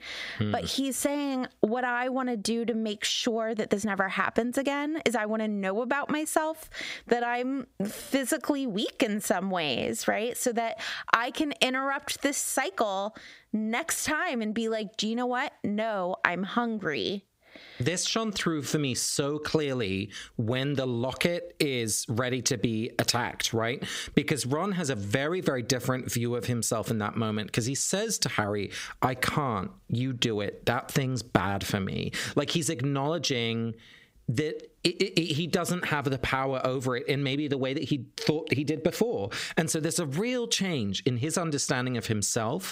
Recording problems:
squashed, flat; heavily

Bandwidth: 15.5 kHz